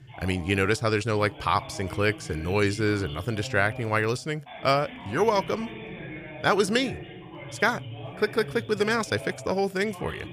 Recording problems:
voice in the background; noticeable; throughout; 15 dB below the speech

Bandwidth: 15 kHz